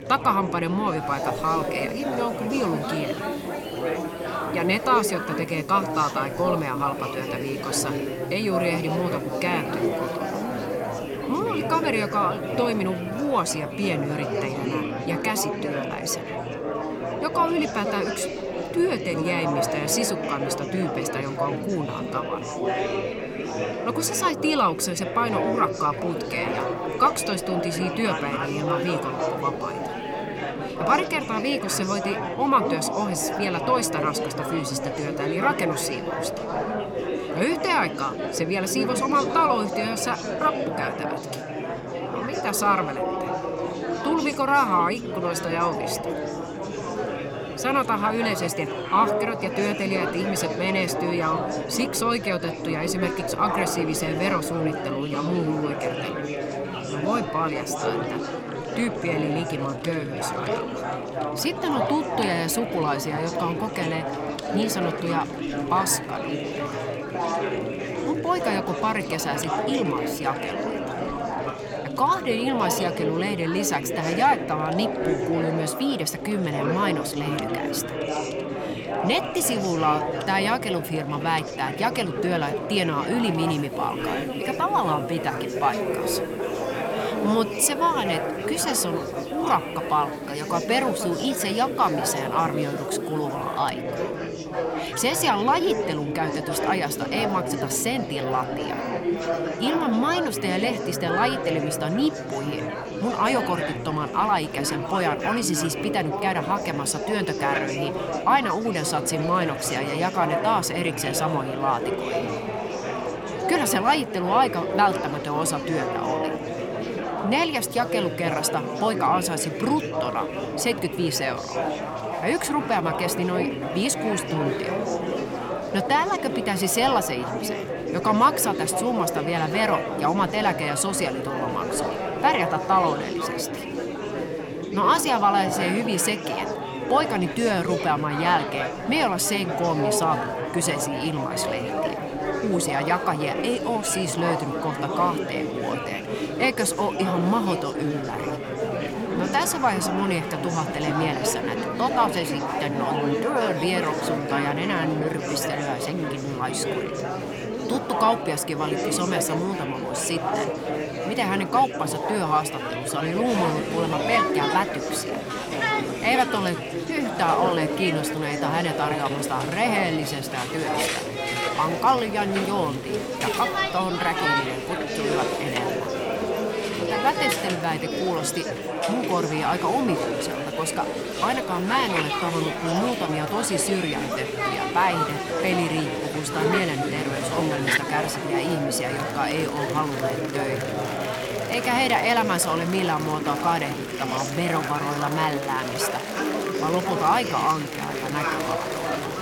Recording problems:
chatter from many people; loud; throughout; 3 dB below the speech
household noises; faint; throughout; 25 dB below the speech

